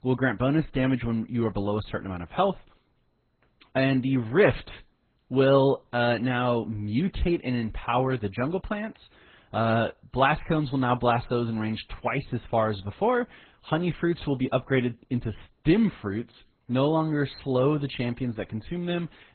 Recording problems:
garbled, watery; badly; nothing above 4 kHz

